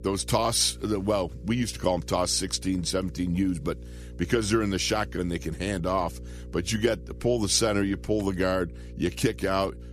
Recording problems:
electrical hum; faint; throughout; 60 Hz, 25 dB below the speech

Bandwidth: 14.5 kHz